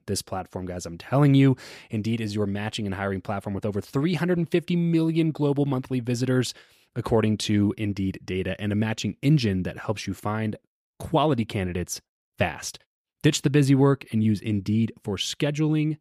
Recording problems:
none

